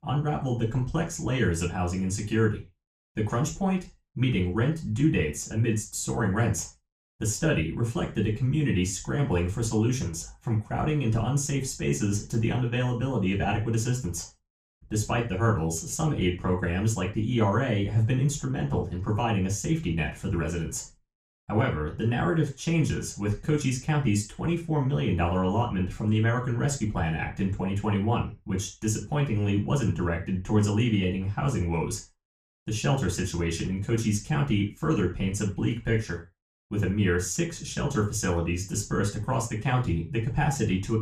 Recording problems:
off-mic speech; far
room echo; slight; dies away in 0.3 s

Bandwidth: 14.5 kHz